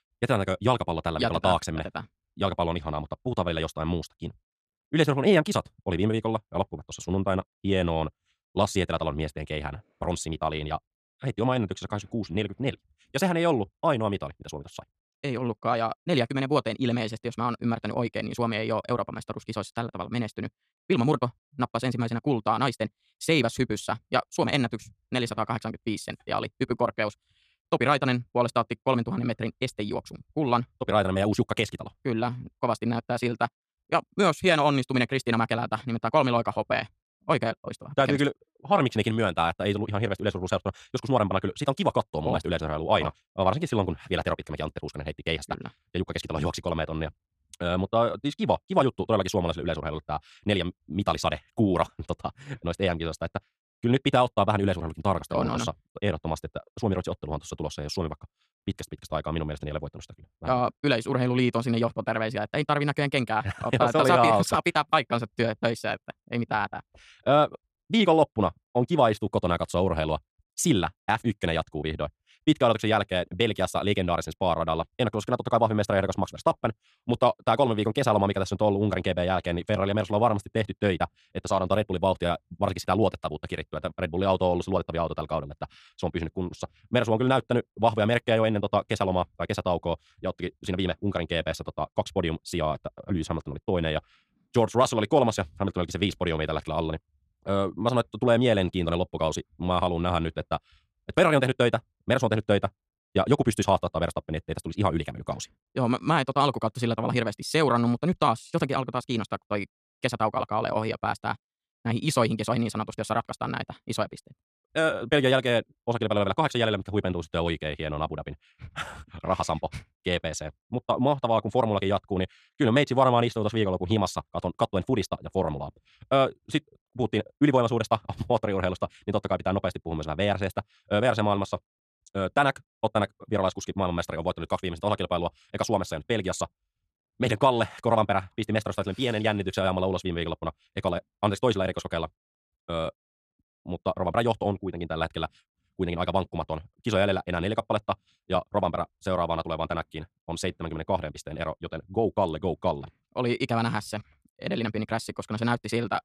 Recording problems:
wrong speed, natural pitch; too fast; 1.6 times normal speed

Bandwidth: 14 kHz